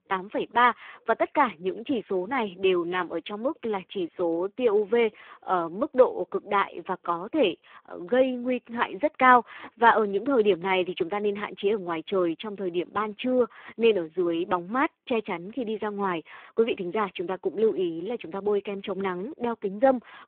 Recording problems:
phone-call audio; poor line

